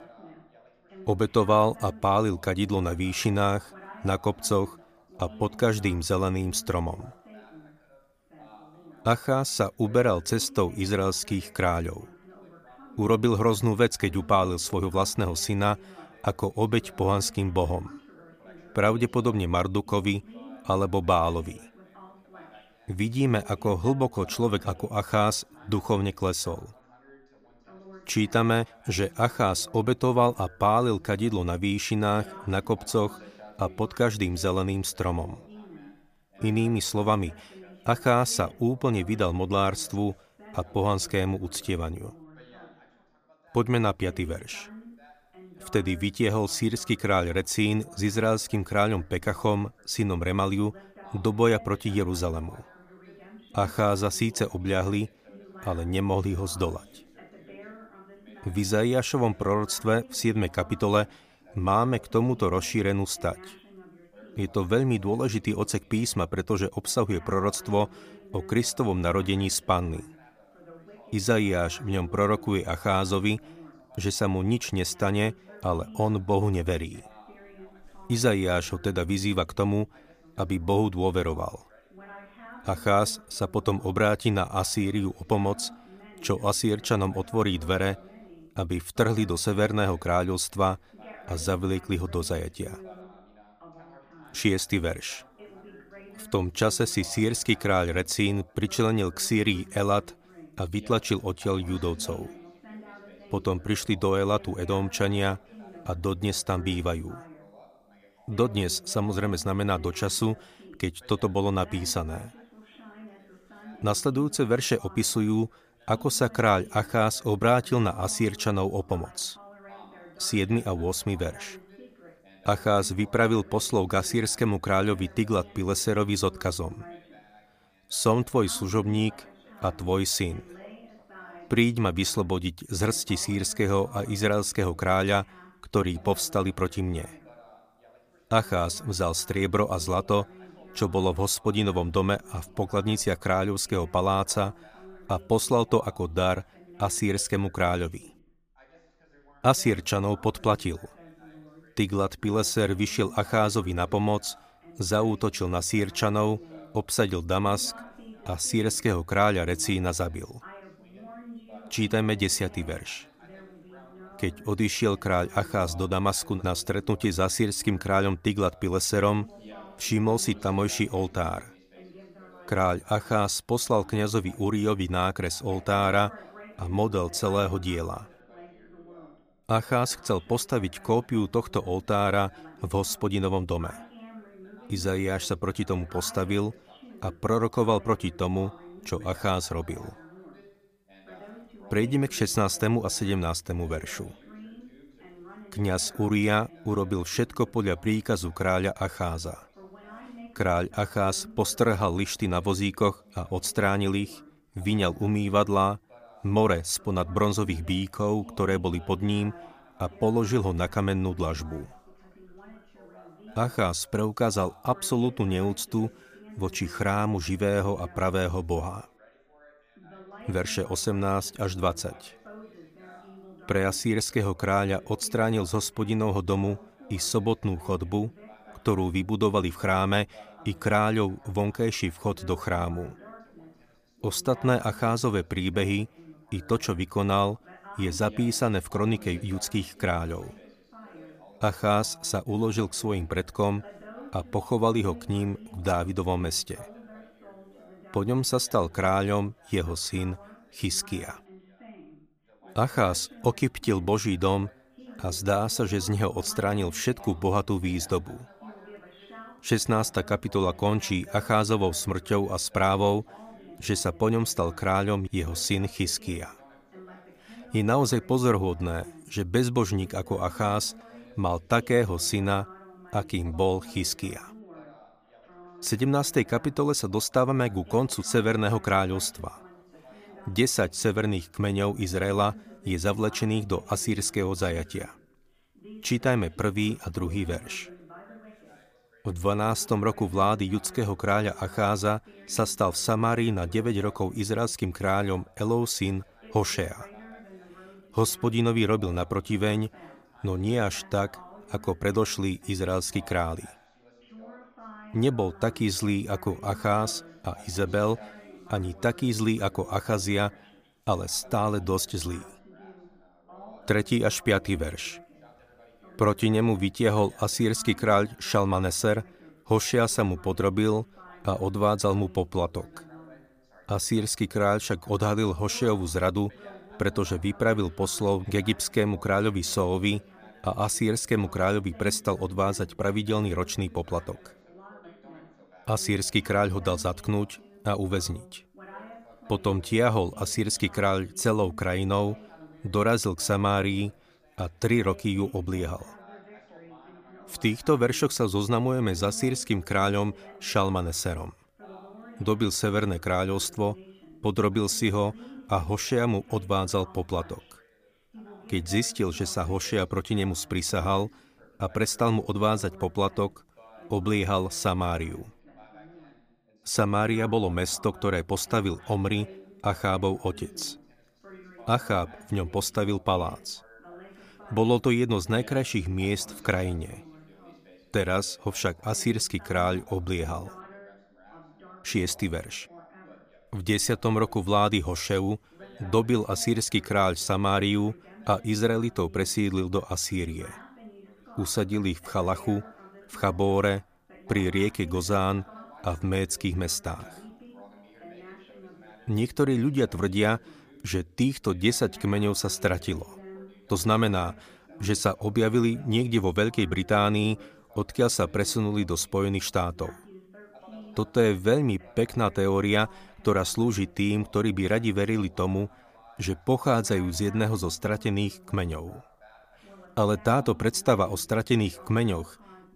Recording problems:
background chatter; faint; throughout; 2 voices, 25 dB below the speech

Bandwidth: 15 kHz